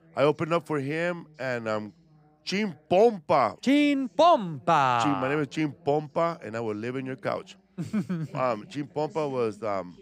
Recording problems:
voice in the background; faint; throughout; 30 dB below the speech

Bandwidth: 15.5 kHz